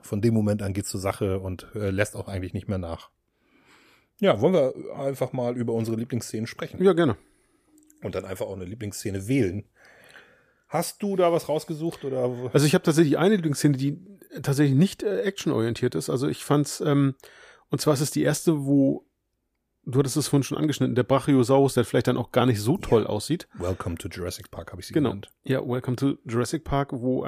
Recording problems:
abrupt cut into speech; at the end

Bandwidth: 14.5 kHz